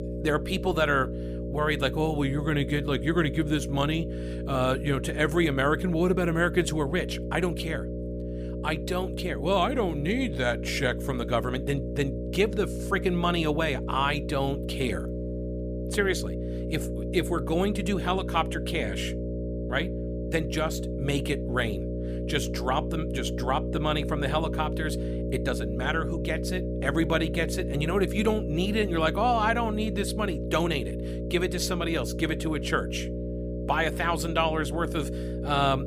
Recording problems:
electrical hum; loud; throughout; 60 Hz, 9 dB below the speech

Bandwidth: 15 kHz